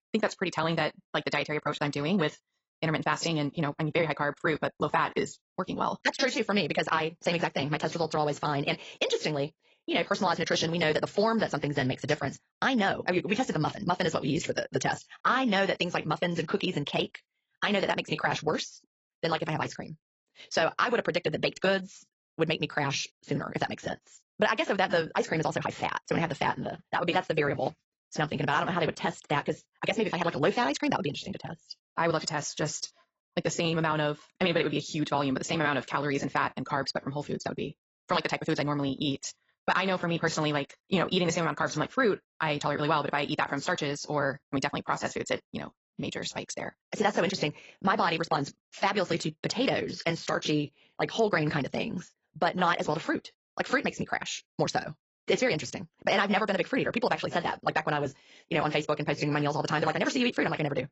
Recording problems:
garbled, watery; badly; nothing above 7.5 kHz
wrong speed, natural pitch; too fast; 1.8 times normal speed

